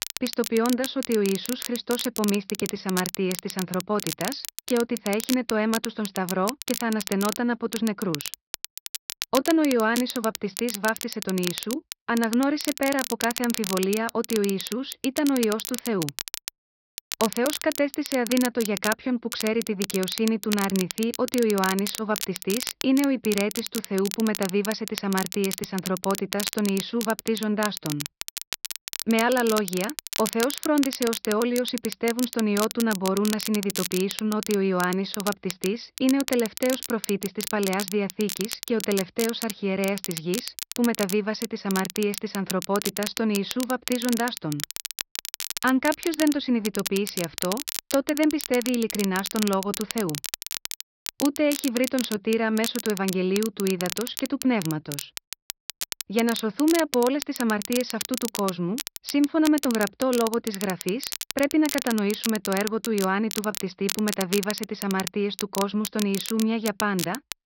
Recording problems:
high frequencies cut off; noticeable; nothing above 5.5 kHz
crackle, like an old record; loud; 7 dB below the speech

